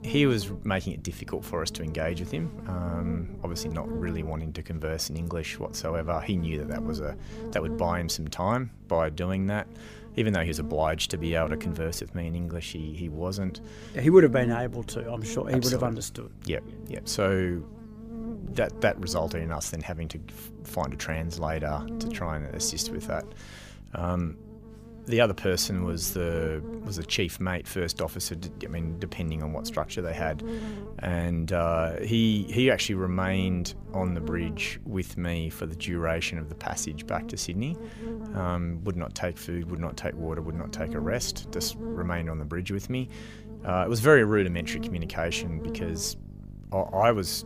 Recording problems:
electrical hum; noticeable; throughout; 50 Hz, 15 dB below the speech

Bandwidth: 15 kHz